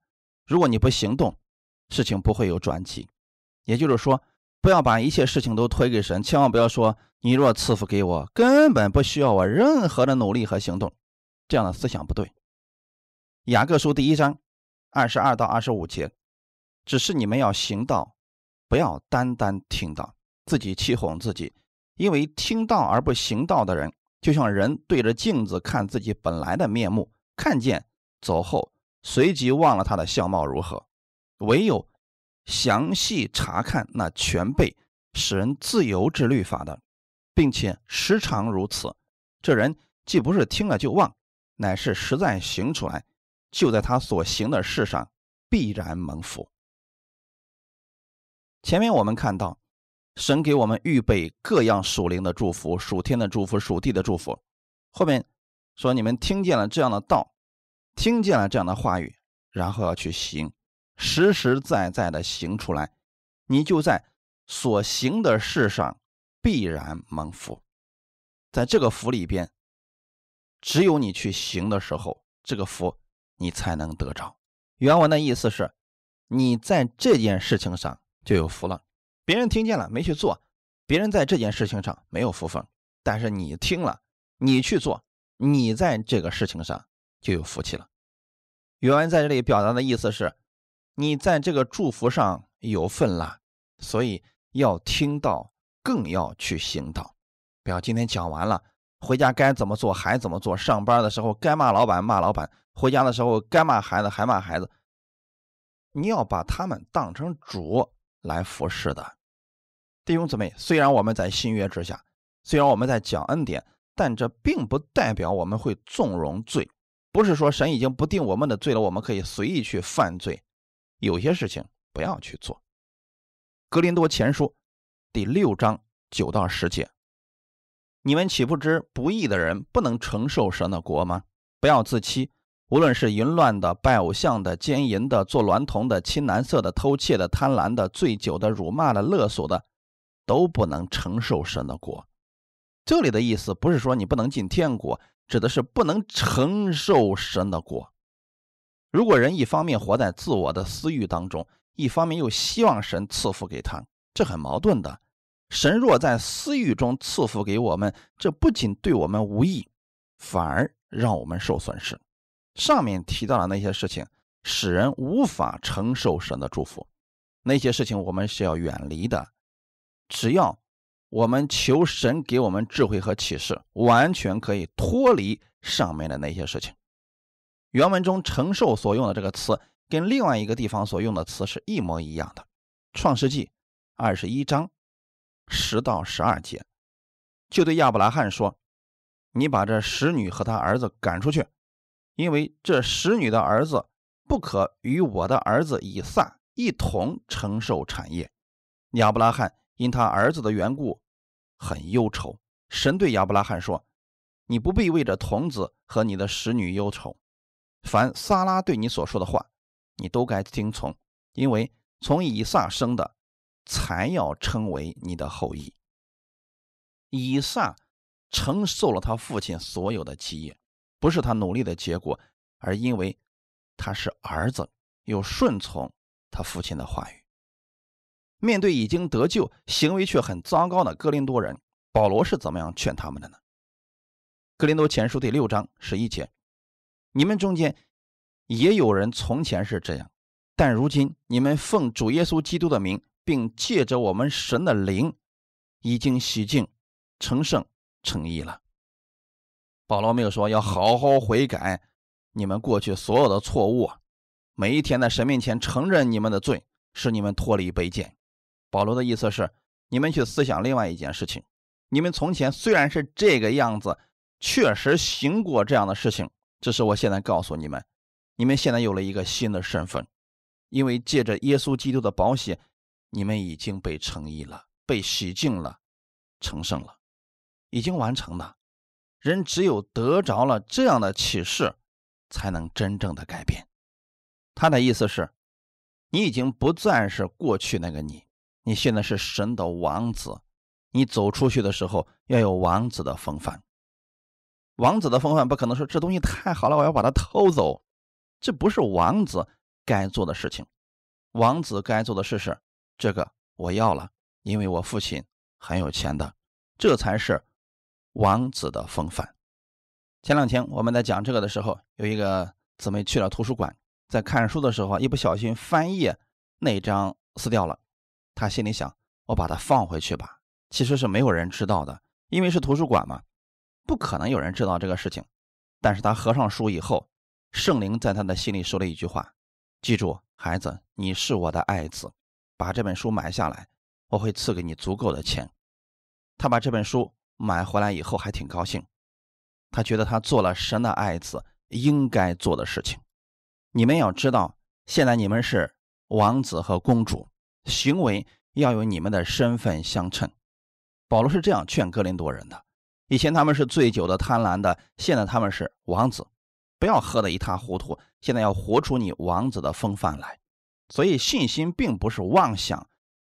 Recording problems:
none

